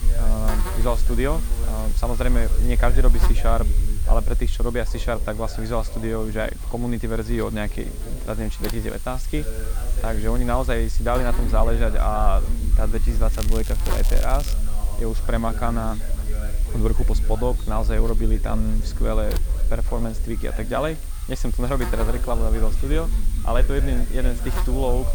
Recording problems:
crackling; loud; from 13 to 15 s; 10 dB below the speech
electrical hum; noticeable; throughout; 50 Hz, 10 dB below the speech
voice in the background; noticeable; throughout; 15 dB below the speech
low rumble; faint; throughout; 20 dB below the speech

